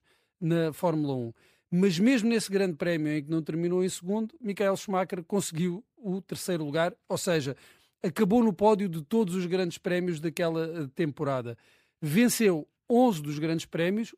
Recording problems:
none

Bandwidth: 15 kHz